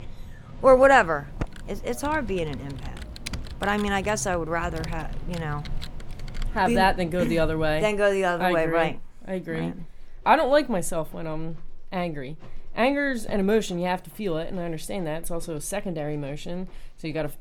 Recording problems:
animal sounds; noticeable; throughout; 20 dB below the speech
keyboard typing; faint; from 1 to 6.5 s; peak 10 dB below the speech

